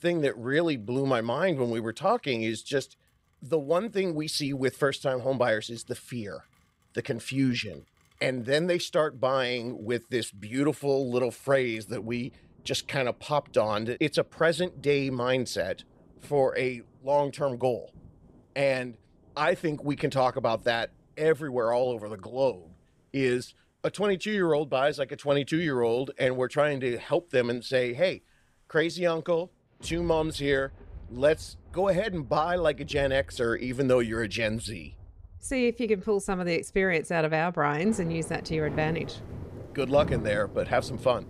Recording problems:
rain or running water; noticeable; throughout; 15 dB below the speech

